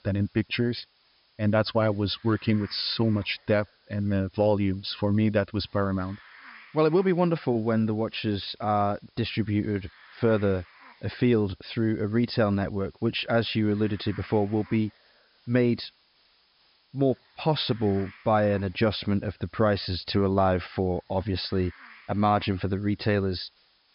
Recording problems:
high frequencies cut off; noticeable; nothing above 5.5 kHz
hiss; faint; throughout; 25 dB below the speech

